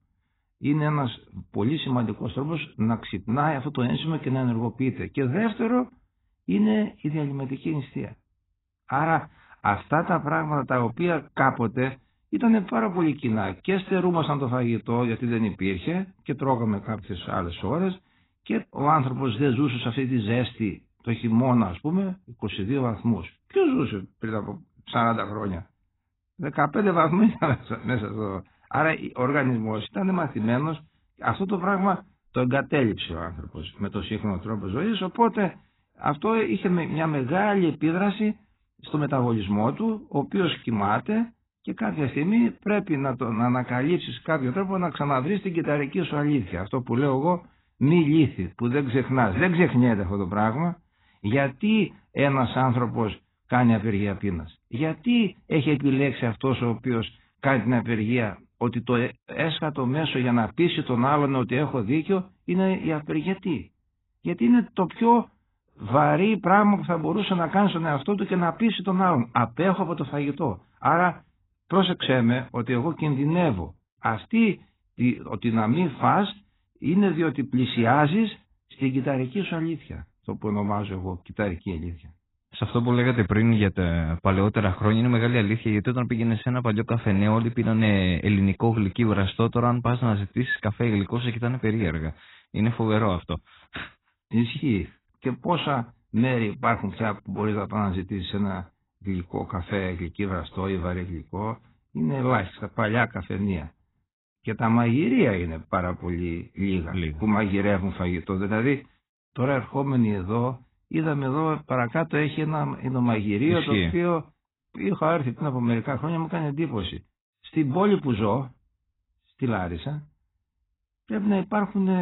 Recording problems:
garbled, watery; badly; nothing above 4 kHz
abrupt cut into speech; at the end

